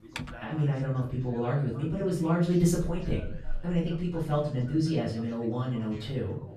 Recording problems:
off-mic speech; far
room echo; noticeable; dies away in 0.5 s
background chatter; faint; throughout; 2 voices, 20 dB below the speech
keyboard typing; faint; at the start; peak 10 dB below the speech

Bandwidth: 13.5 kHz